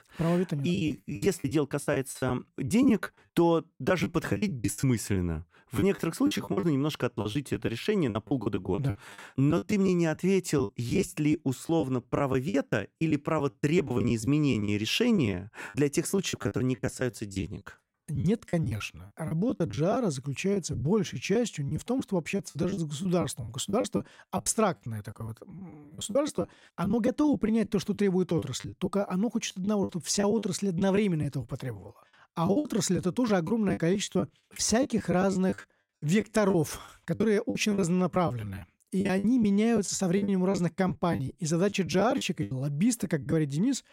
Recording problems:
choppy; very; 14% of the speech affected

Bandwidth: 16 kHz